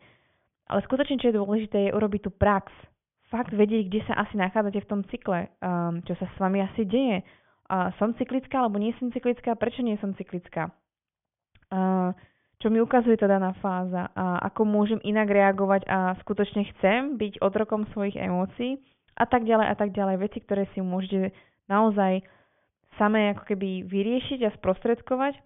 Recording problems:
high frequencies cut off; severe; nothing above 3.5 kHz

